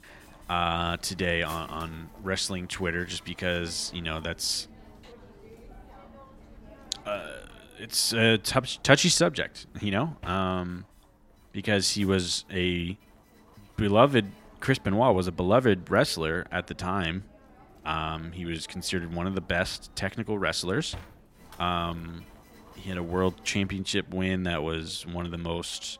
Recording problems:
machinery noise; faint; throughout; 25 dB below the speech

